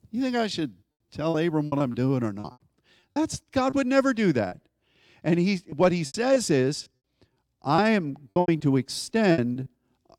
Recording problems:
choppy; very; 10% of the speech affected

